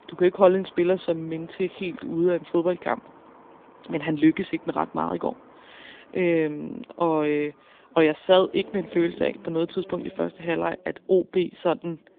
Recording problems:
phone-call audio
traffic noise; faint; throughout; 25 dB below the speech

